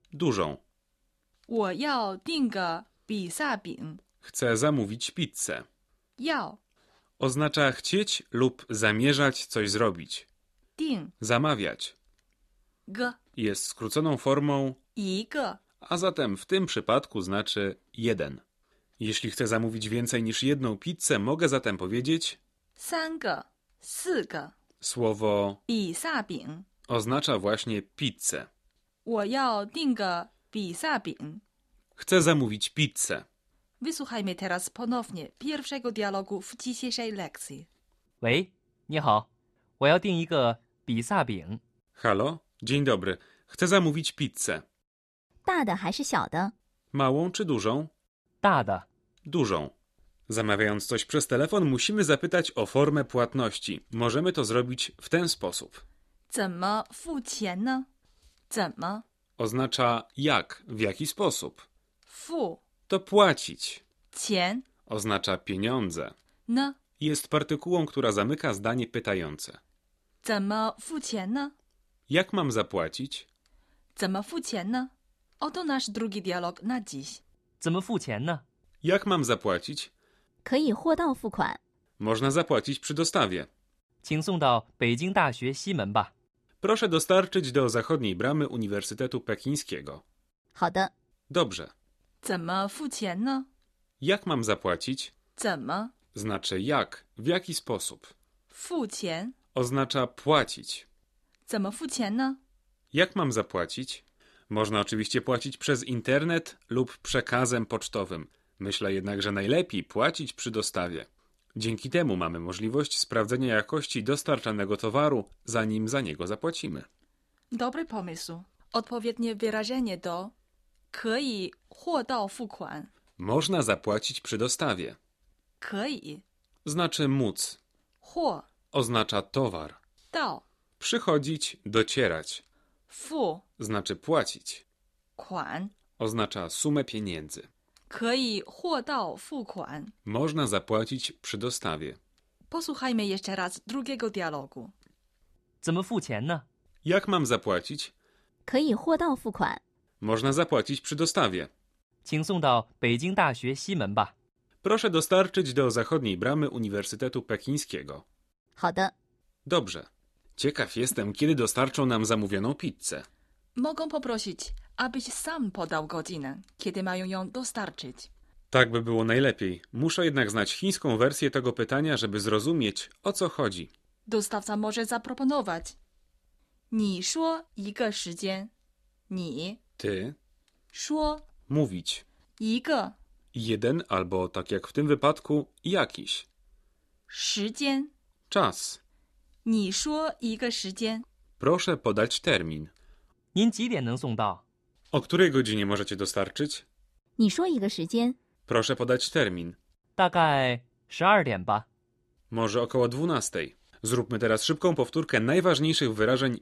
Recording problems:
none

